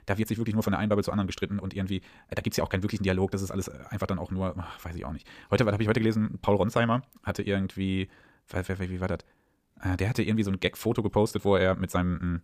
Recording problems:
wrong speed, natural pitch; too fast; 1.6 times normal speed

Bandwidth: 15 kHz